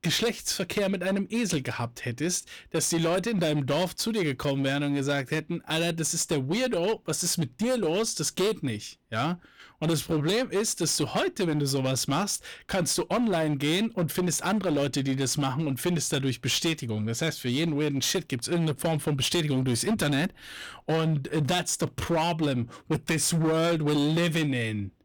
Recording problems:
distortion; slight; 15% of the sound clipped

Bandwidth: 19 kHz